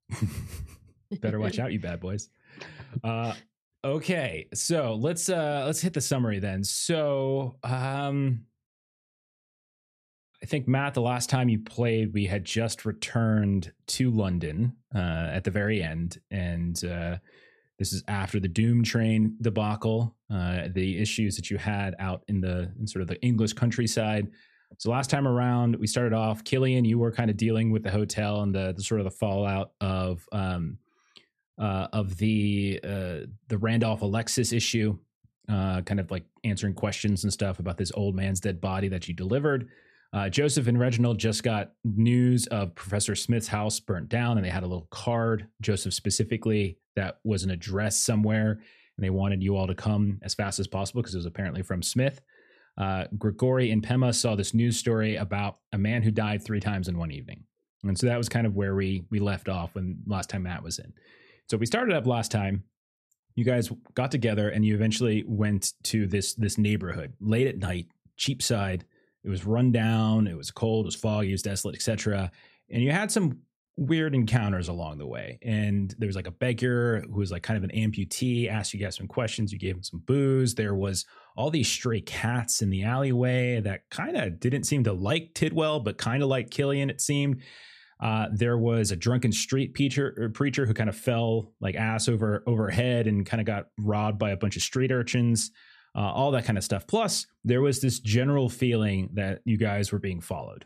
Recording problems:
none

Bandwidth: 14 kHz